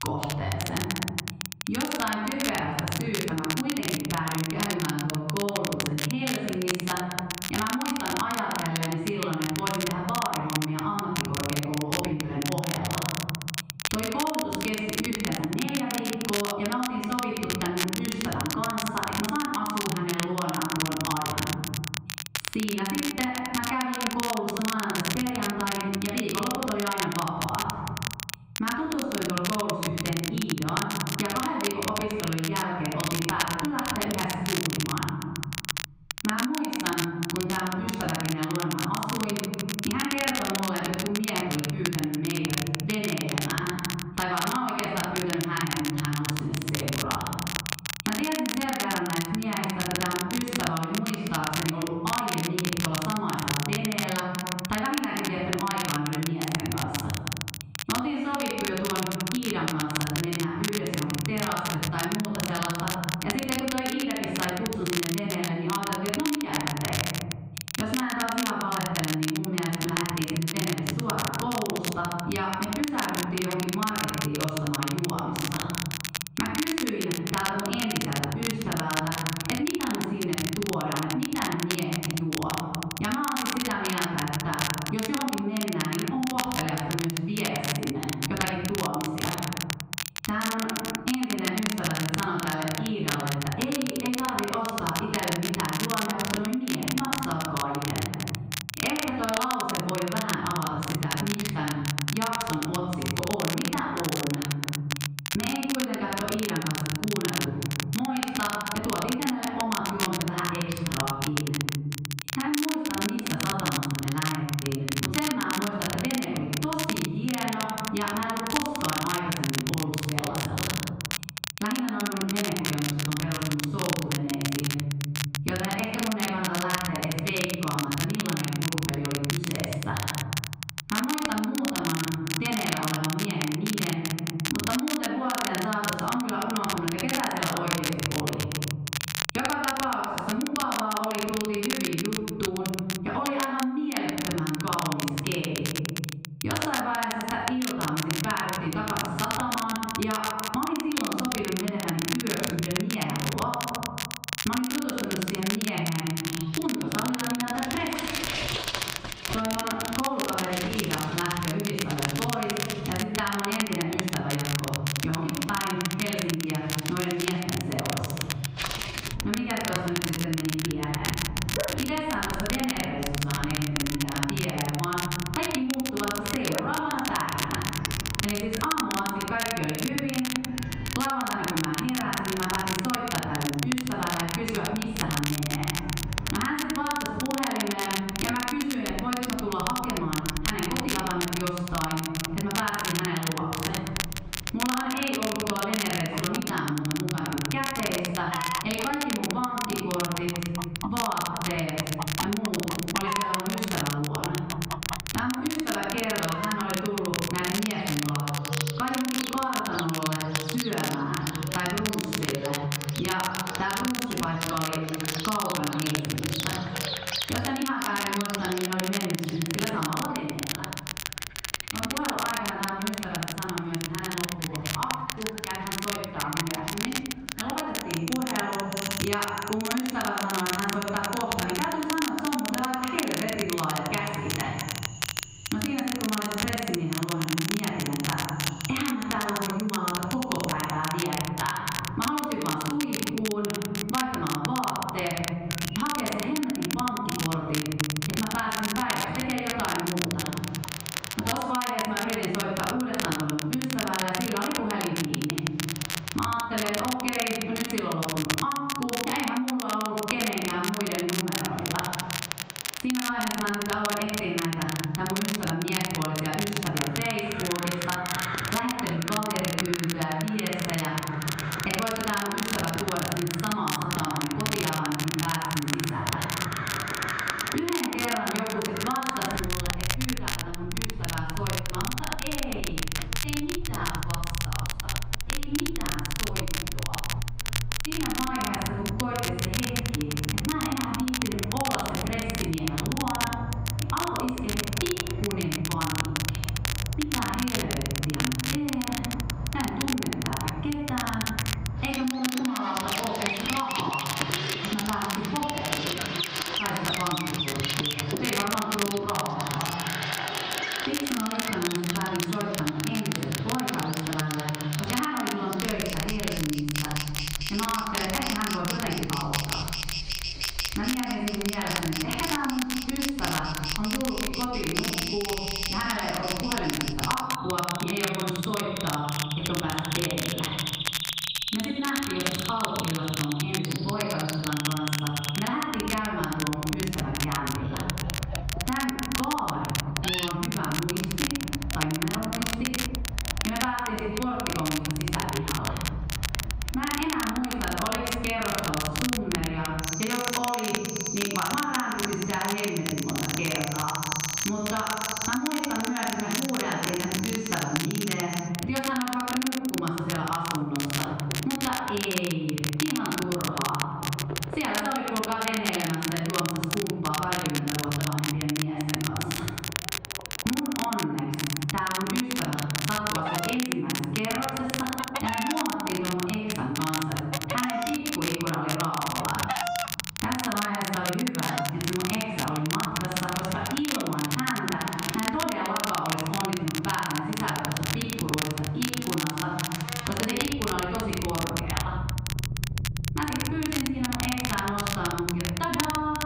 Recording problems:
room echo; strong; dies away in 1 s
off-mic speech; far
muffled; slightly; fading above 3 kHz
squashed, flat; somewhat
animal sounds; loud; from 2:36 on; 7 dB below the speech
crackle, like an old record; loud; 3 dB below the speech

